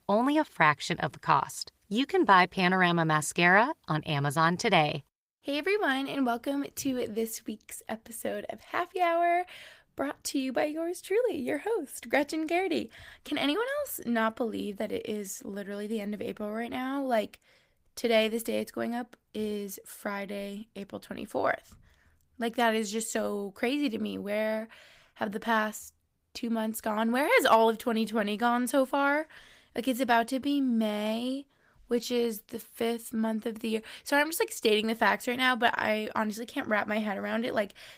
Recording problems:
garbled, watery; slightly; nothing above 15.5 kHz

